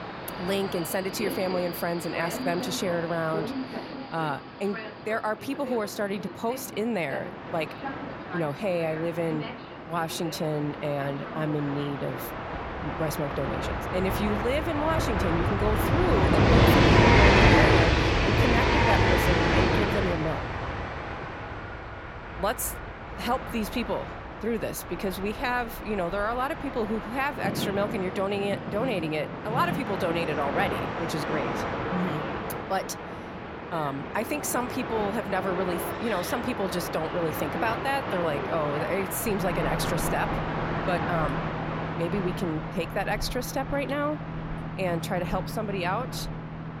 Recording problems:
train or aircraft noise; very loud; throughout; 2 dB above the speech

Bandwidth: 16.5 kHz